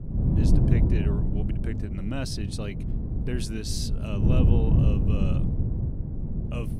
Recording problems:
wind noise on the microphone; heavy; as loud as the speech
dog barking; noticeable; until 3 s; peak 8 dB below the speech

